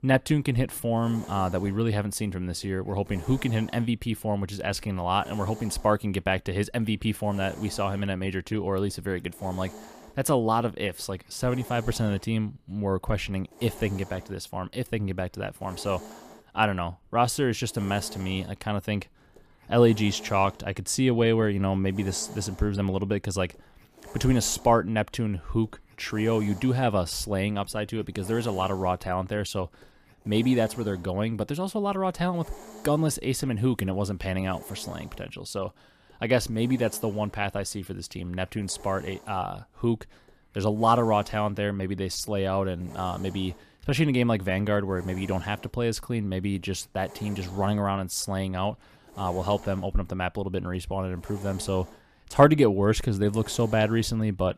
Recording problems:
hiss; noticeable; throughout; 20 dB below the speech

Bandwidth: 14.5 kHz